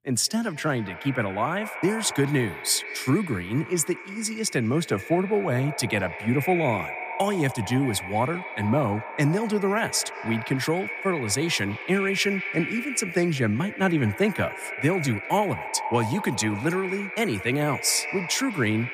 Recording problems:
echo of what is said; strong; throughout; 200 ms later, 8 dB below the speech

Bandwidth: 15 kHz